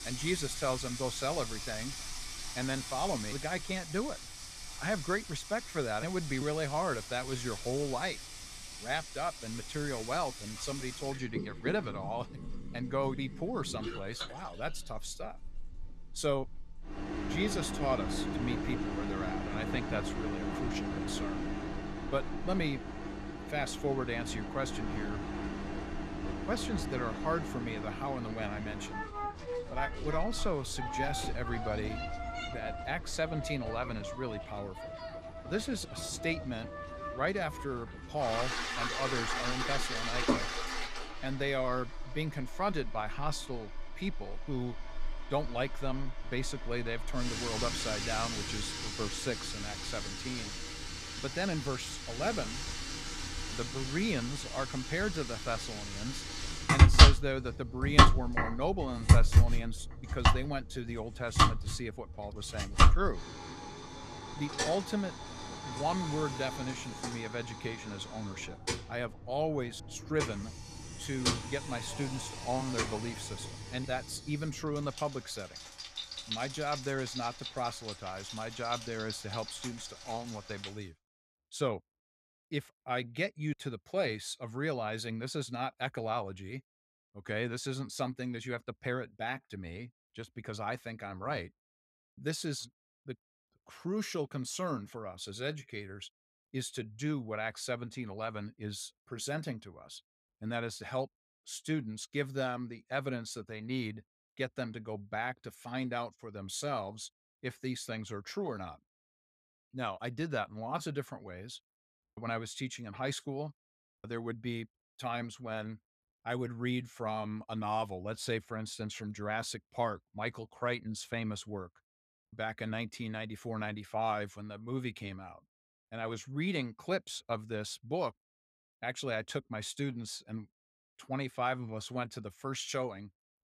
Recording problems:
household noises; very loud; until 1:21; 3 dB above the speech

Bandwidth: 14.5 kHz